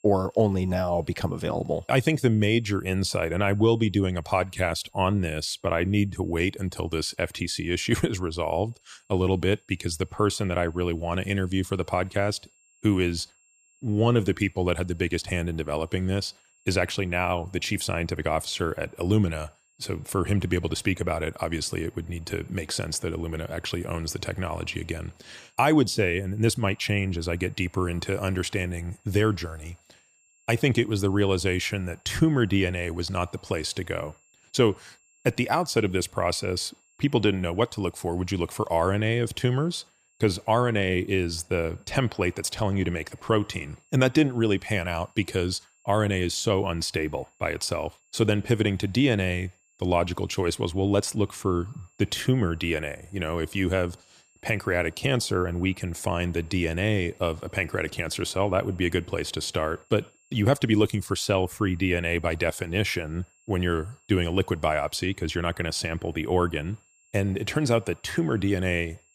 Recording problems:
high-pitched whine; faint; throughout; 7.5 kHz, 35 dB below the speech

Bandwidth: 15 kHz